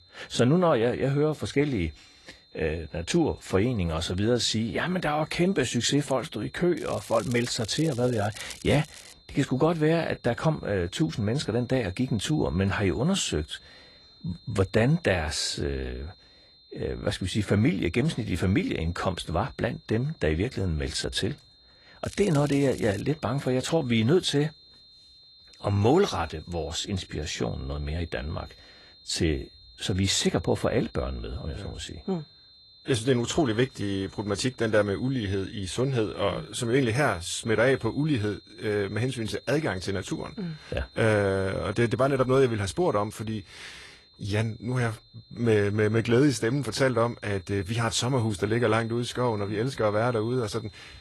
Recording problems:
garbled, watery; slightly; nothing above 11.5 kHz
crackling; noticeable; from 7 to 9 s and at 22 s; 15 dB below the speech
high-pitched whine; faint; throughout; 4 kHz, 25 dB below the speech

